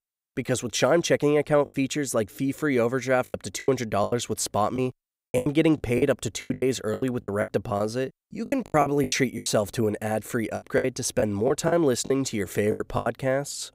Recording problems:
choppy; very; 12% of the speech affected

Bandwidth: 15.5 kHz